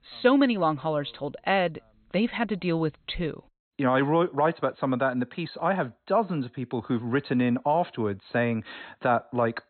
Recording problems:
high frequencies cut off; severe; nothing above 4 kHz

